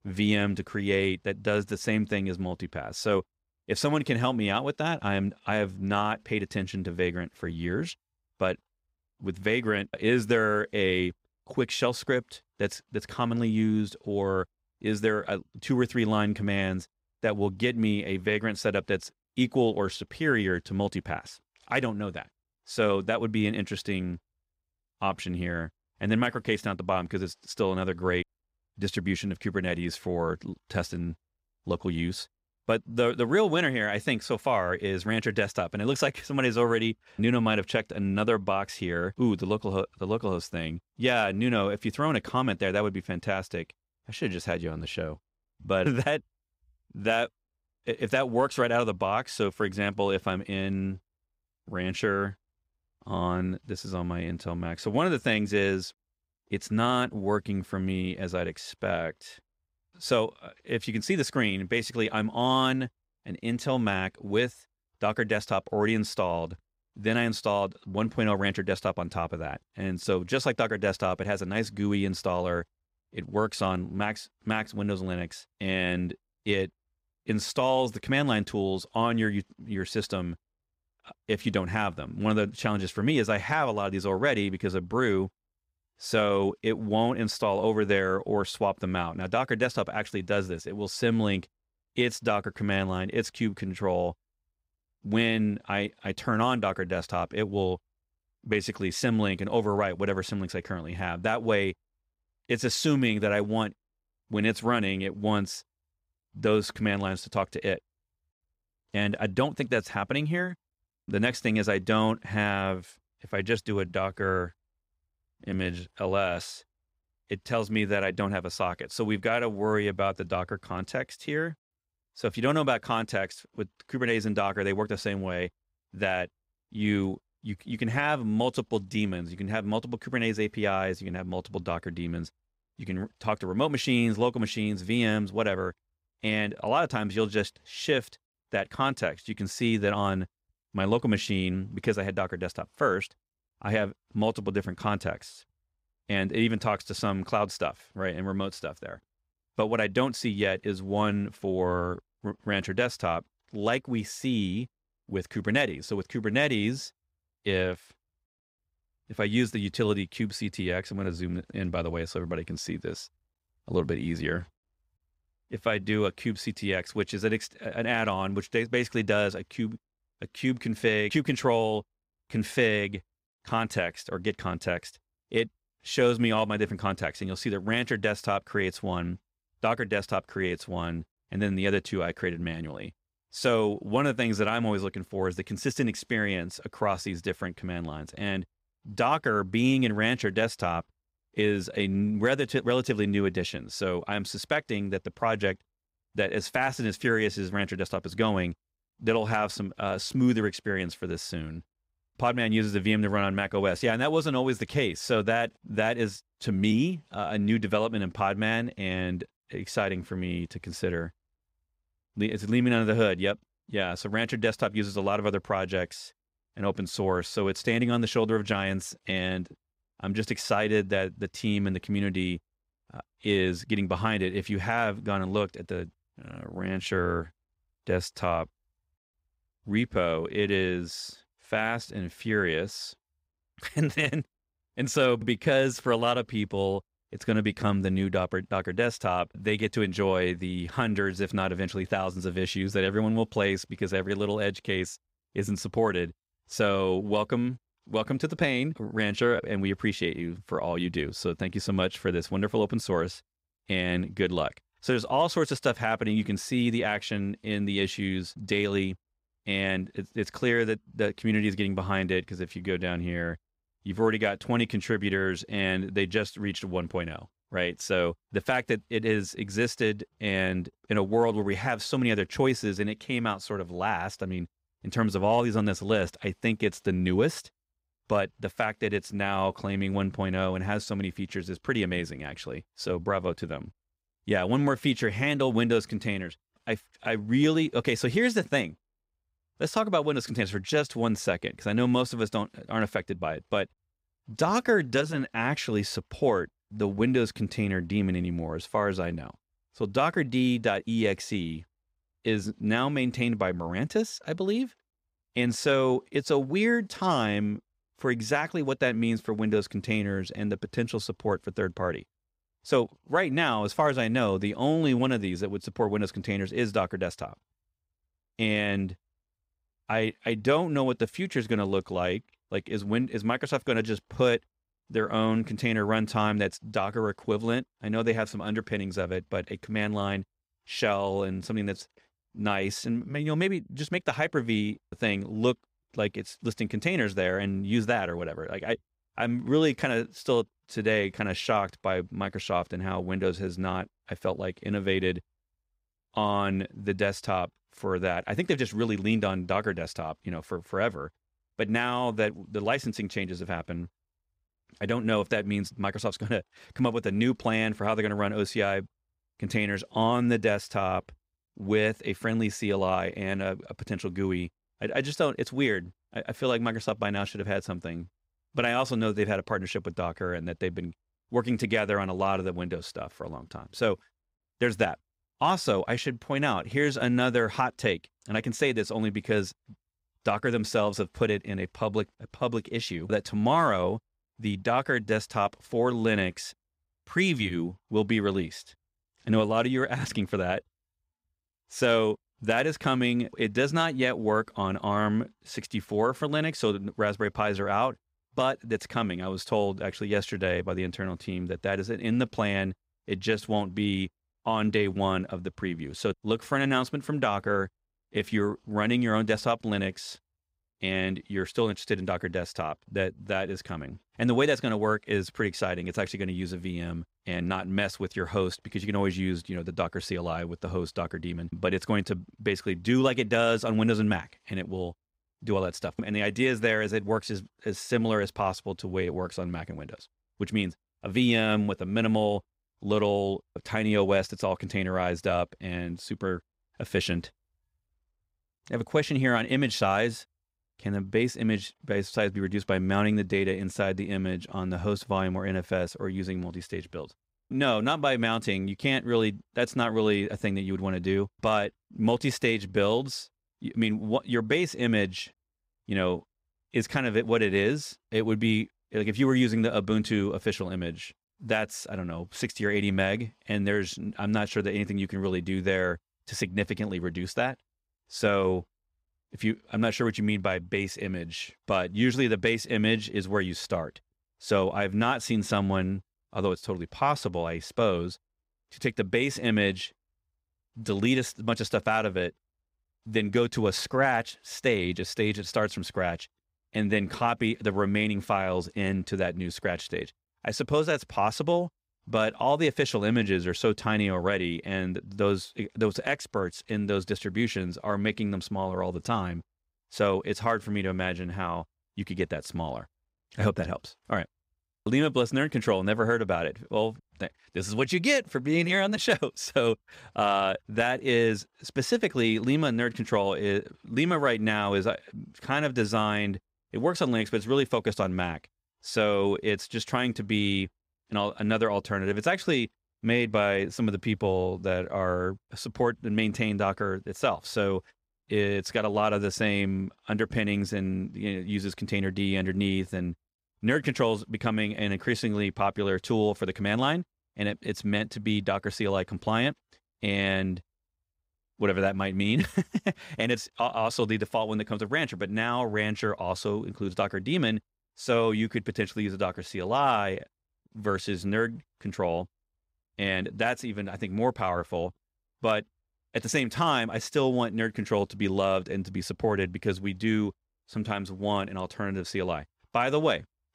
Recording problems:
none

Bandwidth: 15.5 kHz